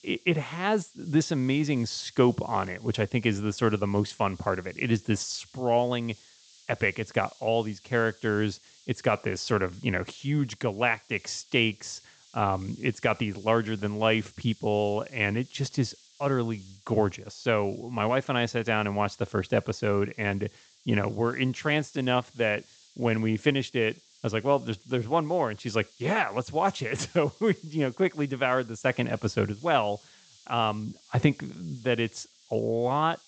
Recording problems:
high frequencies cut off; noticeable; nothing above 8 kHz
hiss; faint; throughout; 25 dB below the speech

